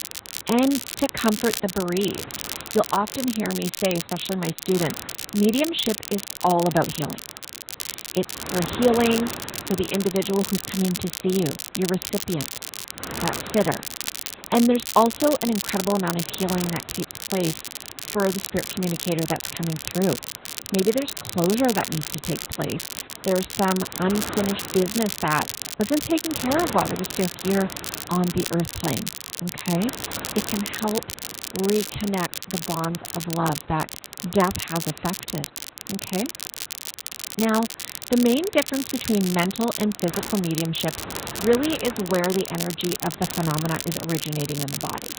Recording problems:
garbled, watery; badly; nothing above 4 kHz
crackle, like an old record; loud; 7 dB below the speech
wind noise on the microphone; occasional gusts; 15 dB below the speech

